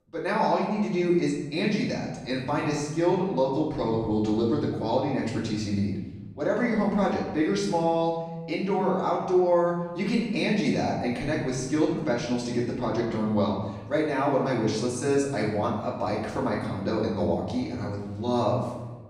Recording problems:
off-mic speech; far
room echo; noticeable; dies away in 1.1 s

